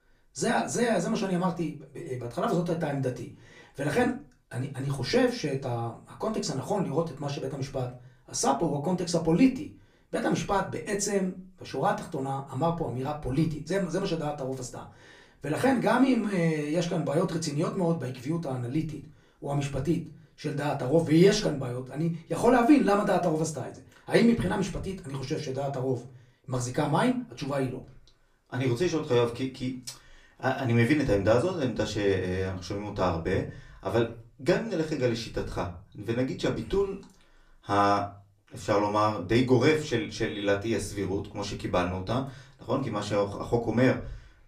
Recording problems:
off-mic speech; far
room echo; very slight; dies away in 0.3 s

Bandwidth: 15 kHz